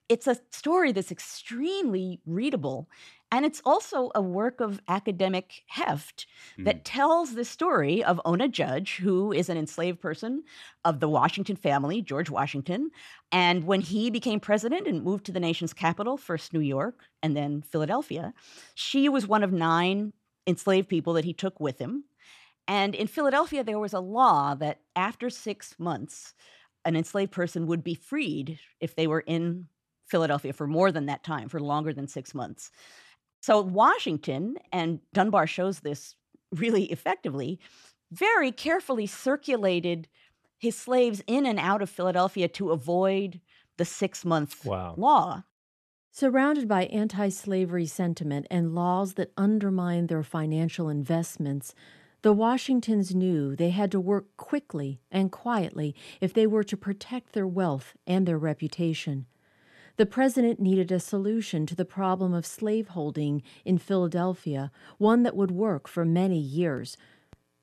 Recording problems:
none

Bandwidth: 13.5 kHz